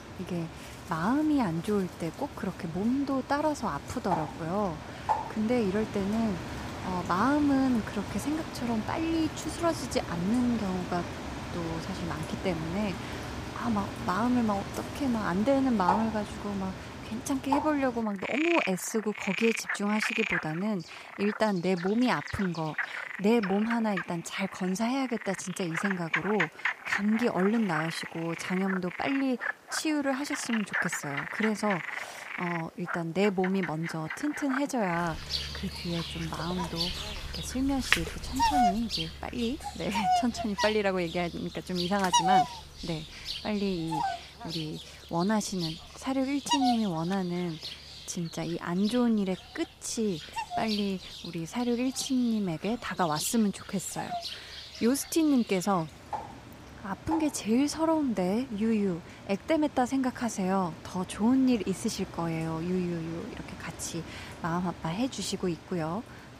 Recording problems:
animal sounds; loud; throughout; 5 dB below the speech

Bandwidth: 15 kHz